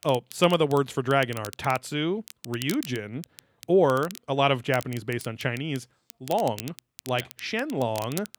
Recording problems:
crackle, like an old record; noticeable; 15 dB below the speech

